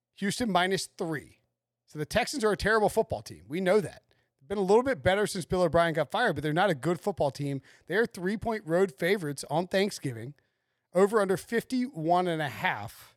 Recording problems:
none

